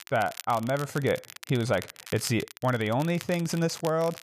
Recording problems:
crackle, like an old record; noticeable; 15 dB below the speech

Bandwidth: 14.5 kHz